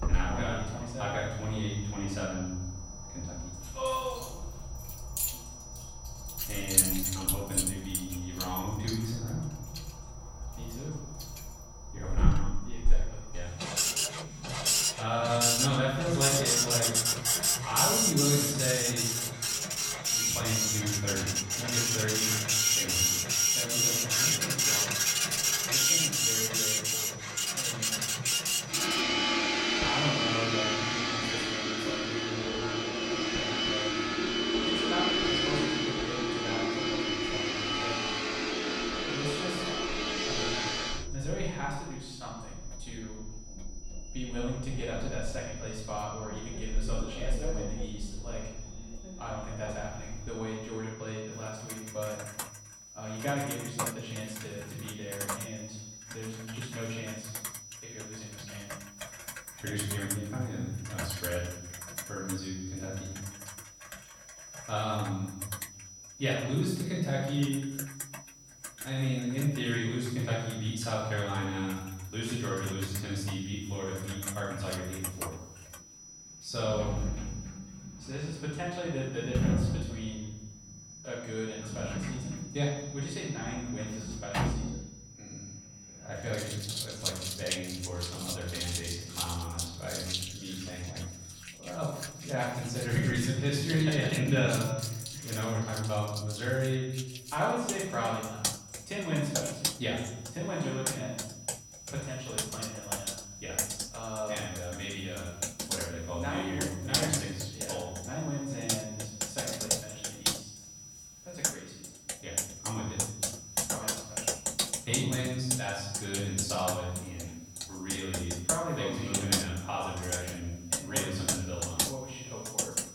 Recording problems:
off-mic speech; far
room echo; noticeable; dies away in 0.9 s
household noises; very loud; throughout; 5 dB above the speech
high-pitched whine; noticeable; throughout; 6 kHz, 15 dB below the speech

